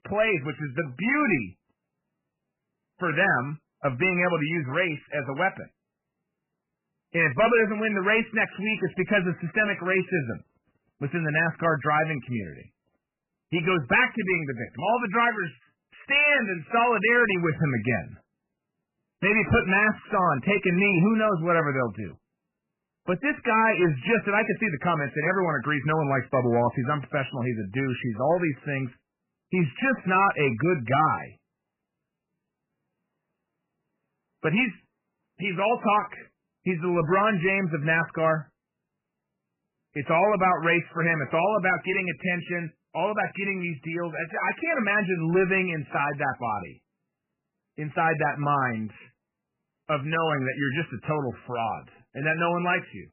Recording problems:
garbled, watery; badly; nothing above 3 kHz
distortion; slight; 4% of the sound clipped

